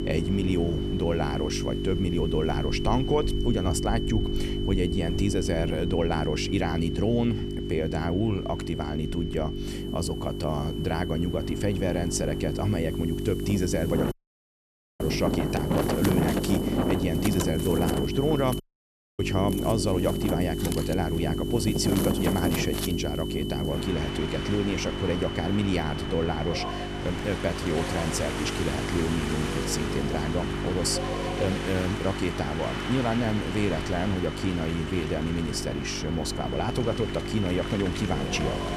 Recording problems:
electrical hum; loud; throughout; 50 Hz, 6 dB below the speech
wind in the background; loud; throughout; 5 dB below the speech
high-pitched whine; noticeable; throughout; 3 kHz, 15 dB below the speech
audio cutting out; at 14 s for 1 s and at 19 s for 0.5 s

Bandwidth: 14 kHz